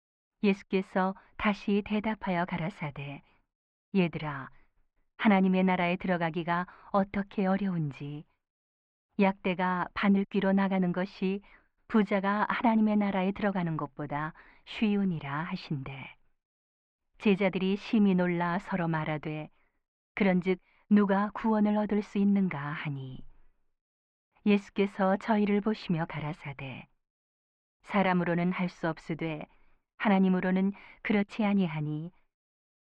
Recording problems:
muffled; very; fading above 2.5 kHz

